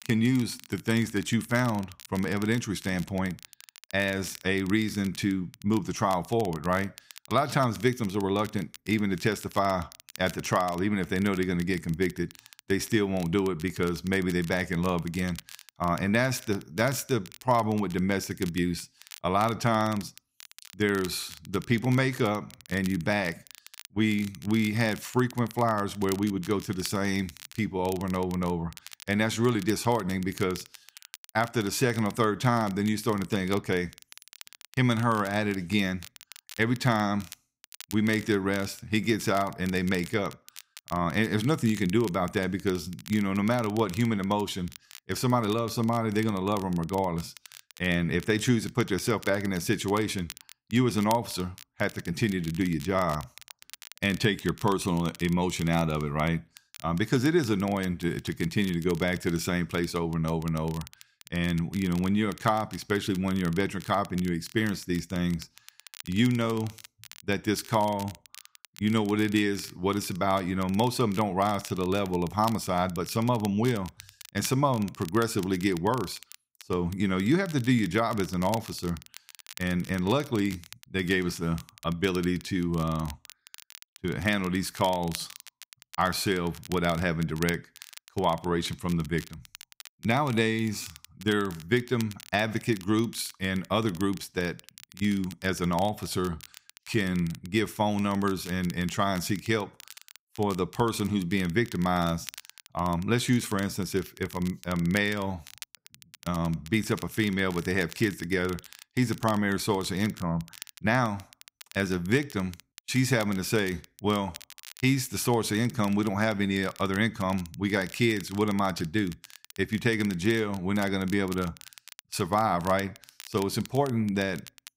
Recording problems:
crackle, like an old record; noticeable; 20 dB below the speech

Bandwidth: 15.5 kHz